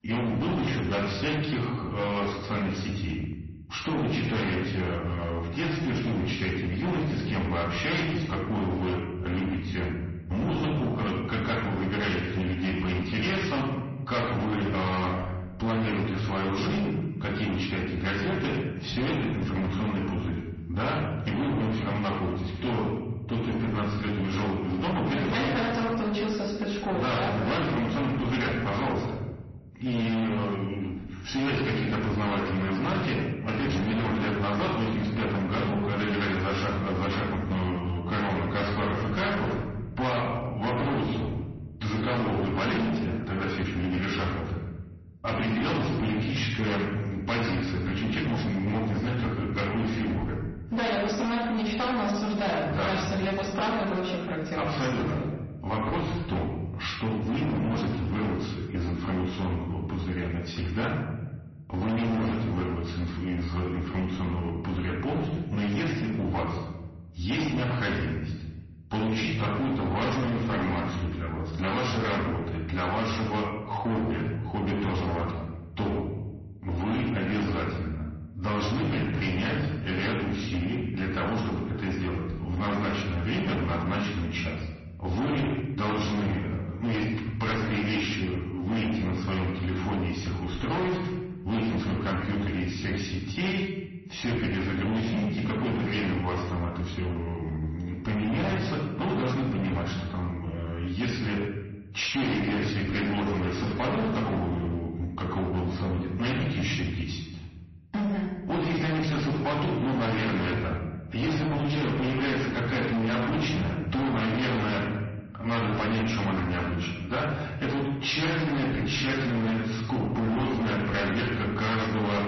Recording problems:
distortion; heavy; 26% of the sound clipped
off-mic speech; far
room echo; noticeable; dies away in 1 s
garbled, watery; slightly; nothing above 6 kHz

